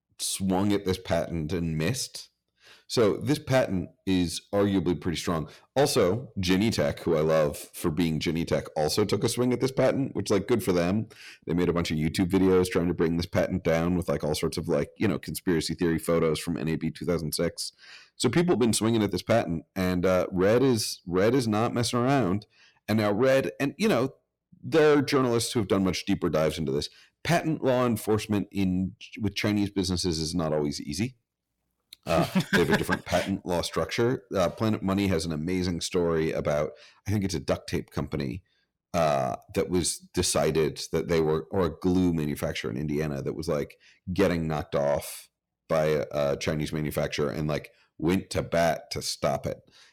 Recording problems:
distortion; slight; 10 dB below the speech

